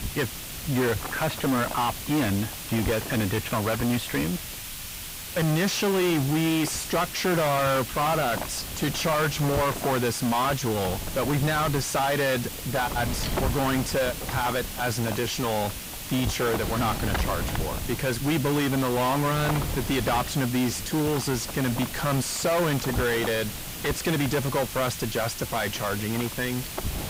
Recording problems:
distortion; heavy; 5 dB below the speech
hiss; loud; throughout; 9 dB below the speech
wind noise on the microphone; occasional gusts; 10 dB below the speech

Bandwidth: 15.5 kHz